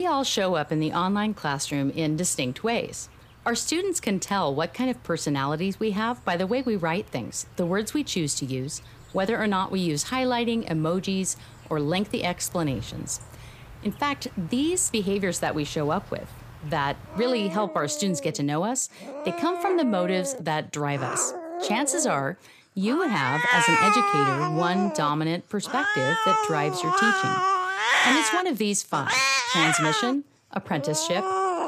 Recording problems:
animal sounds; very loud; throughout; 1 dB above the speech
abrupt cut into speech; at the start

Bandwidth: 15 kHz